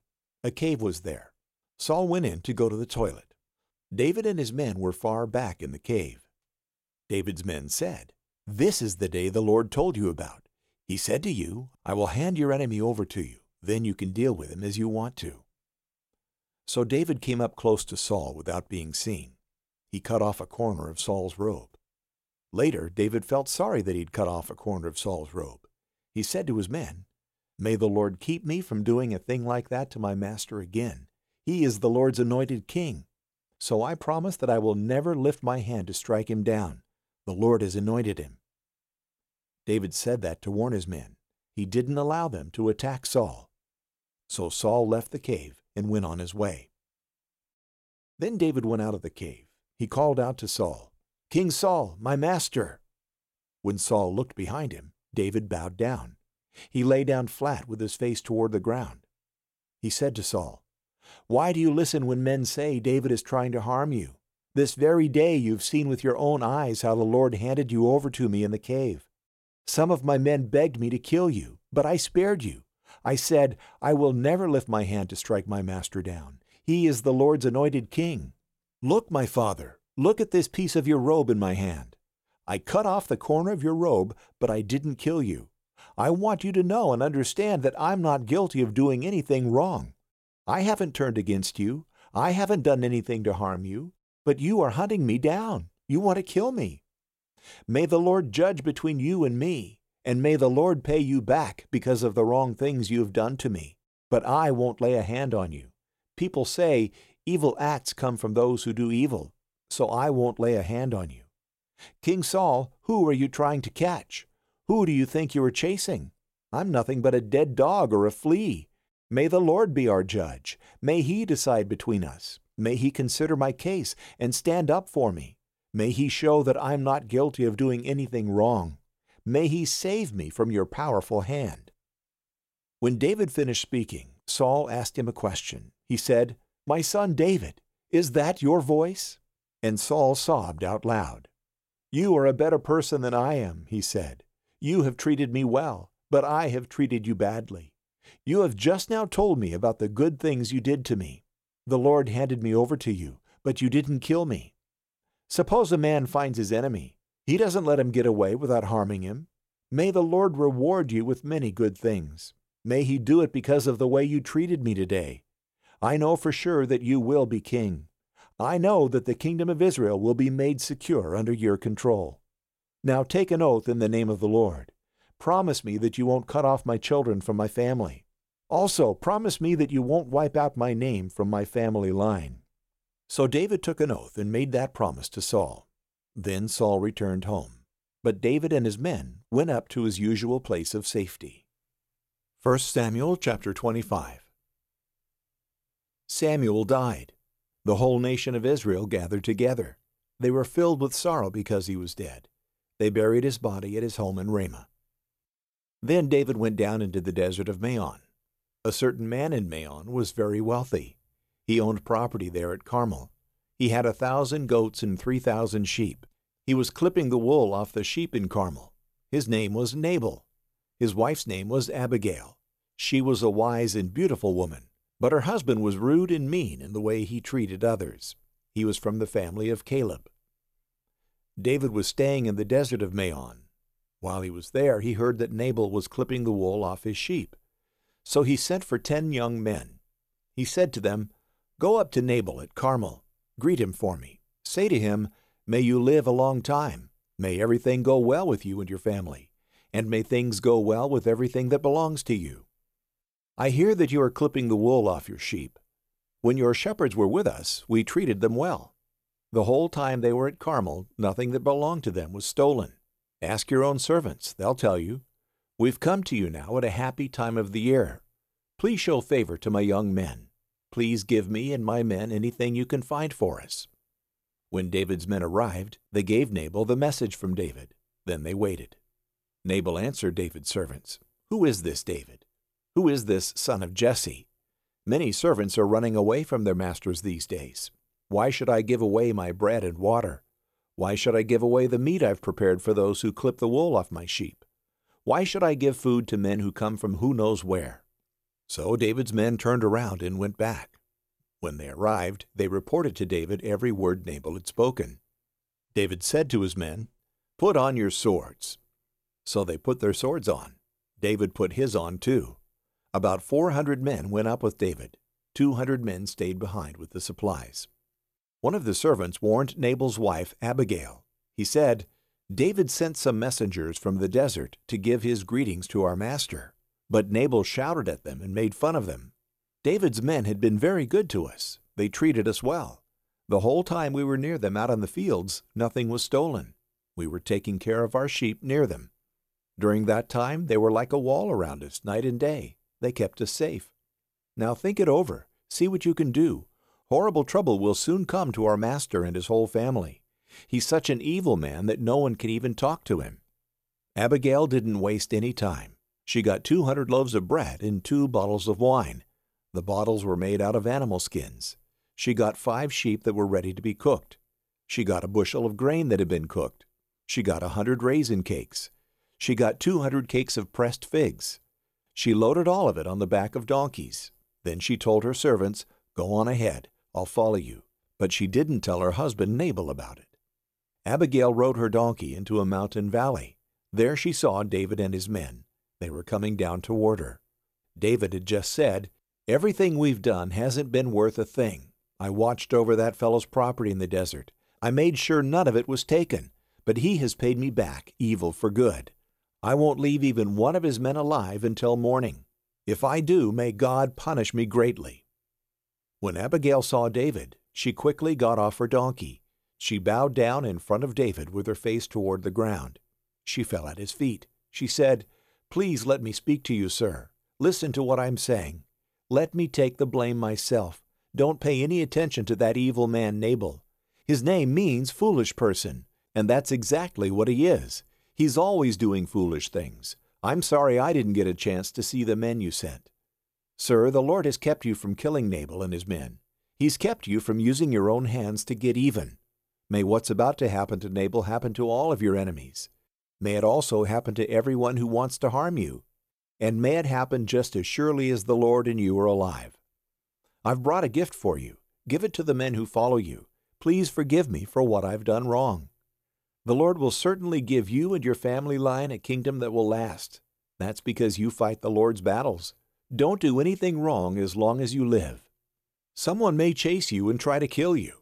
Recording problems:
none

